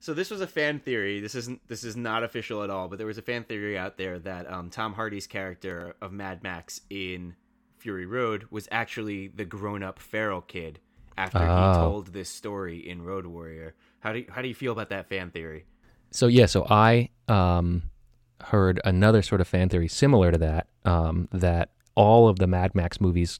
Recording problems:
none

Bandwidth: 18 kHz